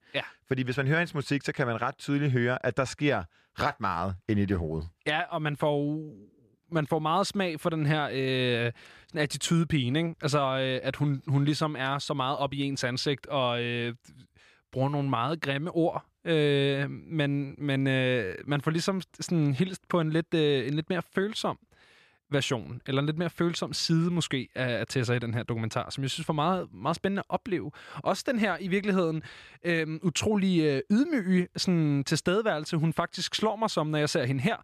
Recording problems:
none

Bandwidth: 14.5 kHz